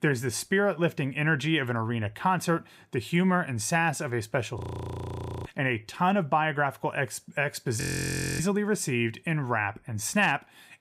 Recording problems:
audio freezing; at 4.5 s for 1 s and at 8 s for 0.5 s

